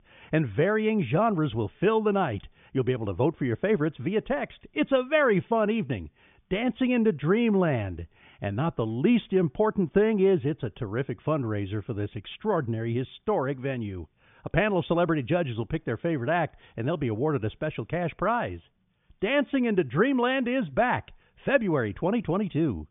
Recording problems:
high frequencies cut off; severe; nothing above 3.5 kHz

